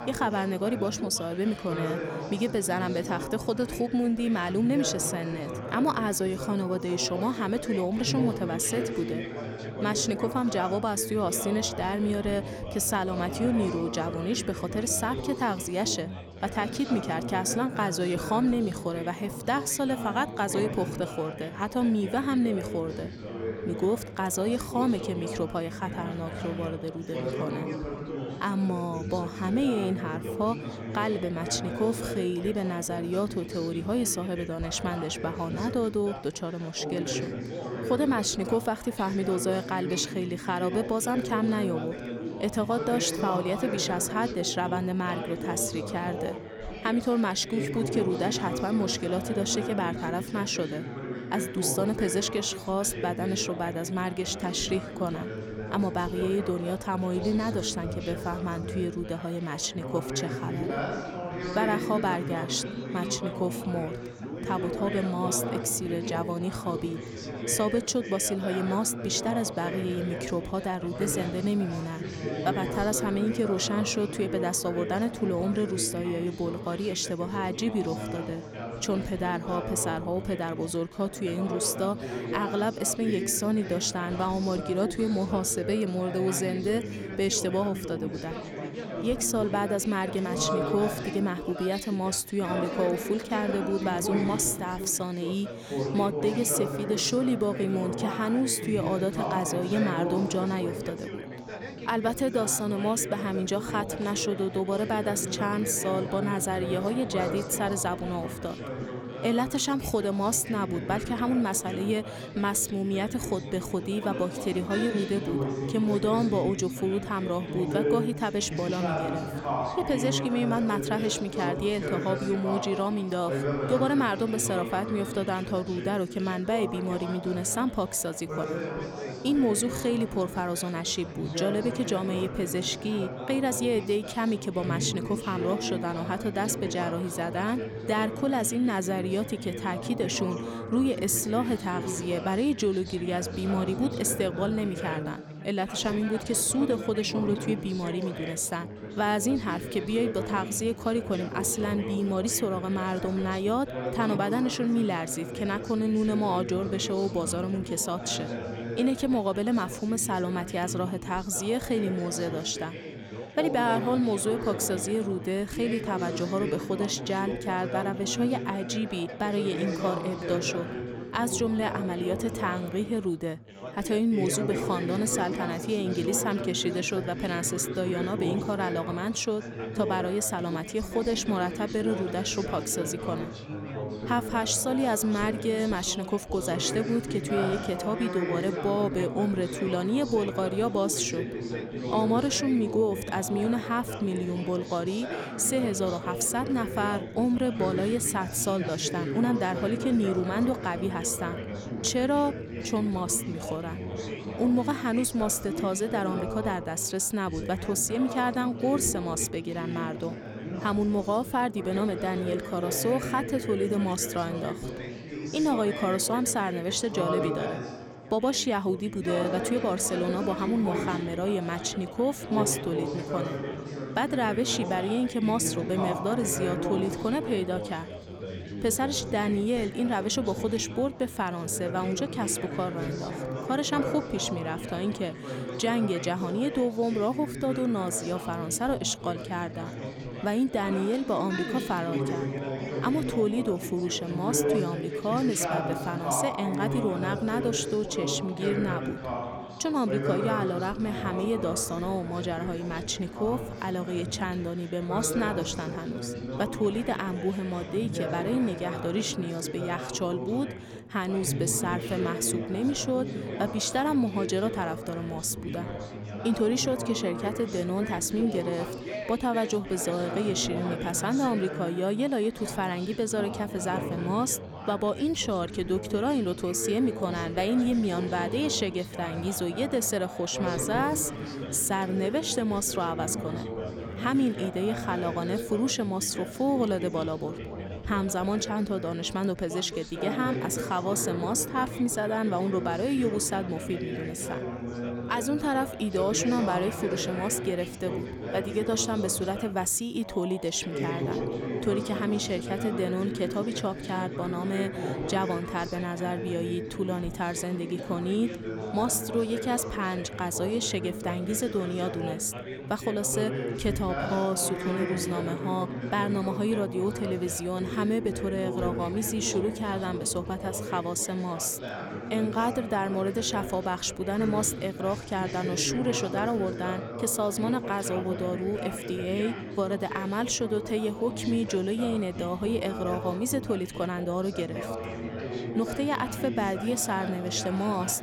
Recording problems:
background chatter; loud; throughout; 4 voices, 6 dB below the speech

